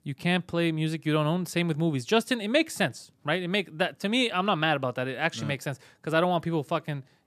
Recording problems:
none

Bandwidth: 14 kHz